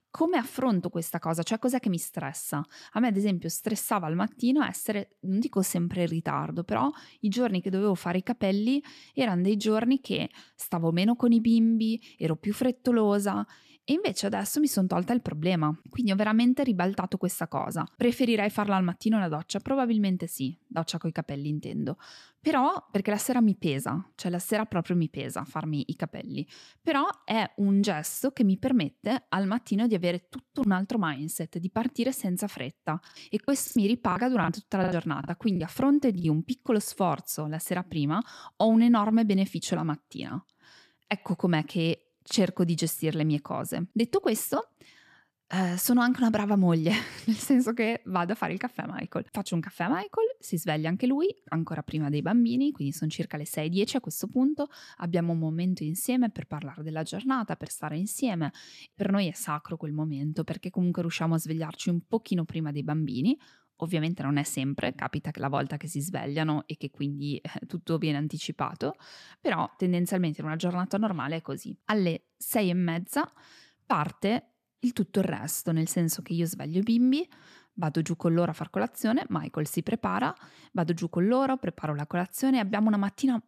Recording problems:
choppy; very; from 33 to 36 s; 14% of the speech affected

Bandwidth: 14.5 kHz